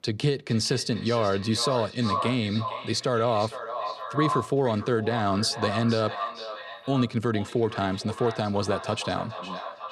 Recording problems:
echo of what is said; strong; throughout; 460 ms later, 8 dB below the speech

